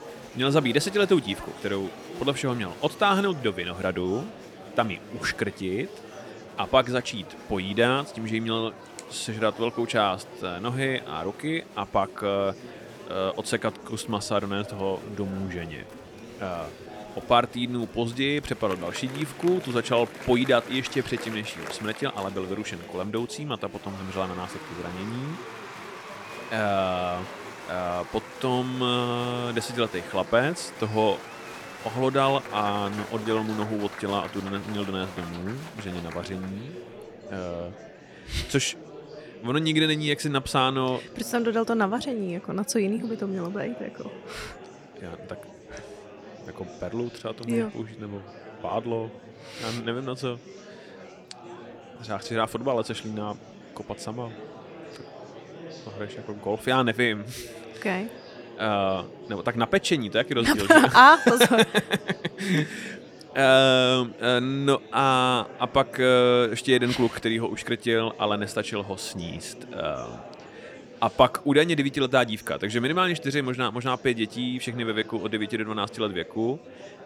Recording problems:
murmuring crowd; noticeable; throughout; 15 dB below the speech

